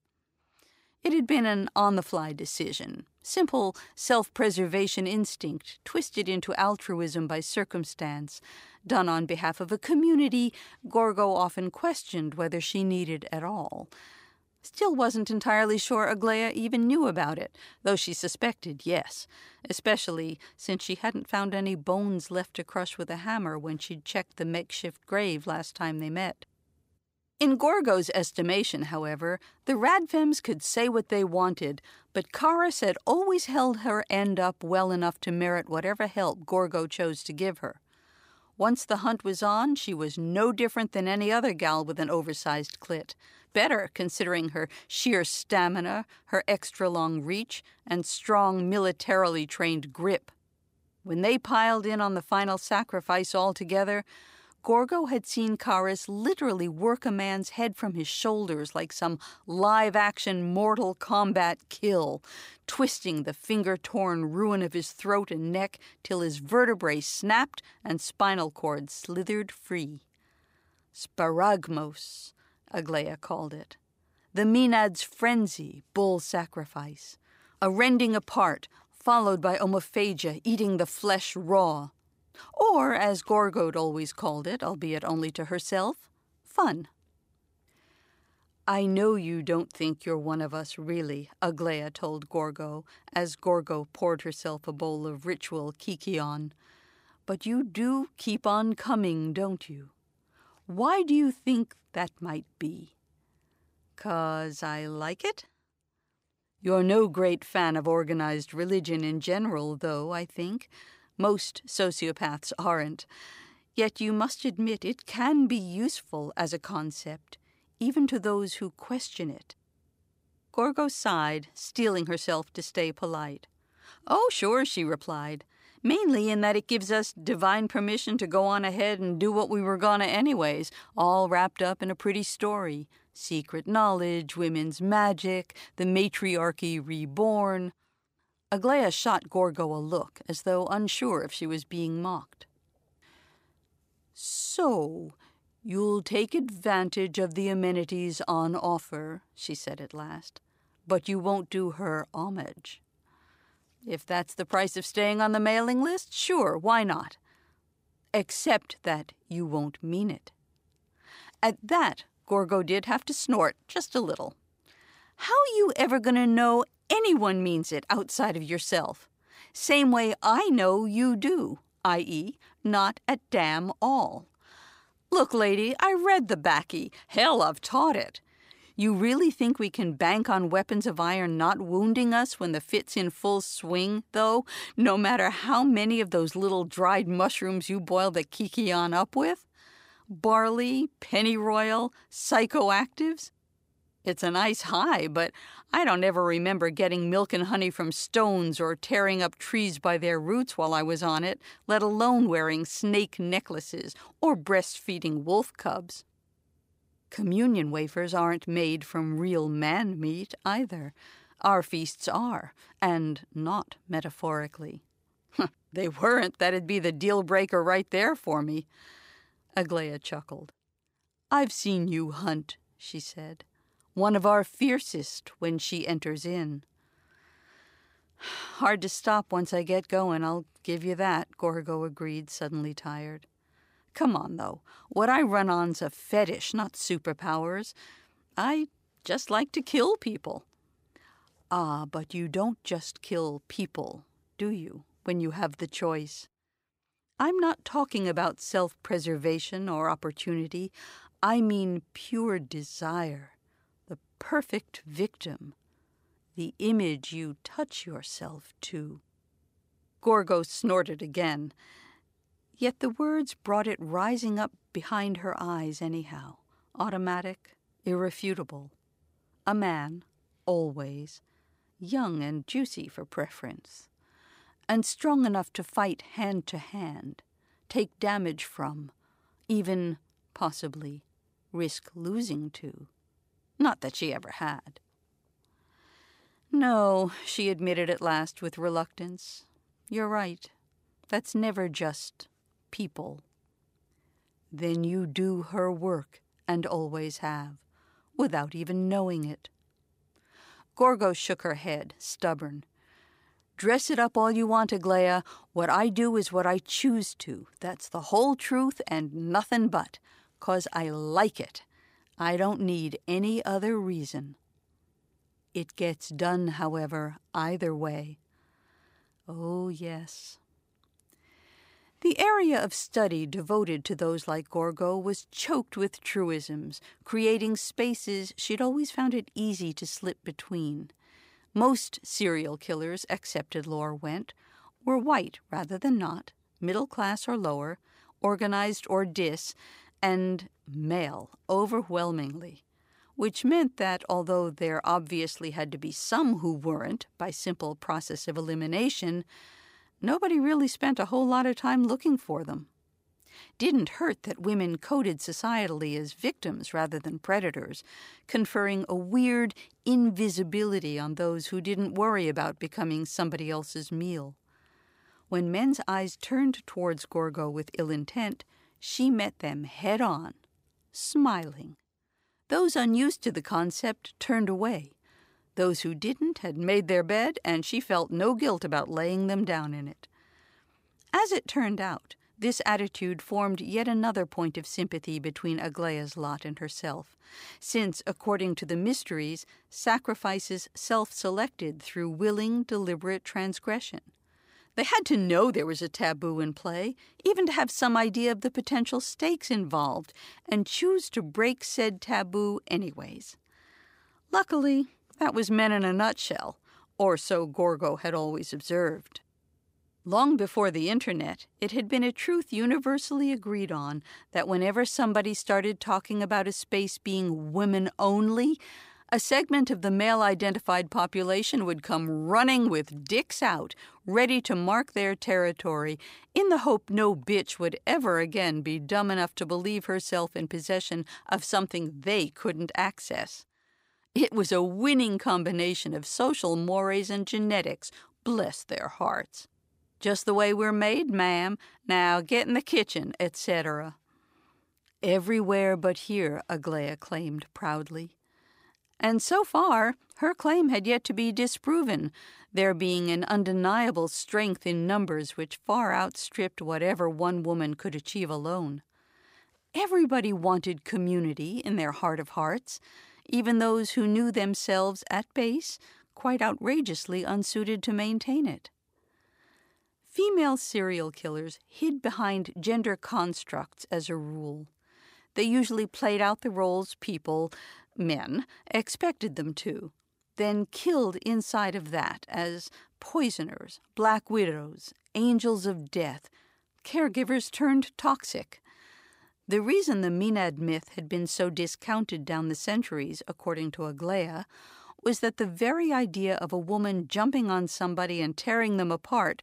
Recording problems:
none

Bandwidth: 15.5 kHz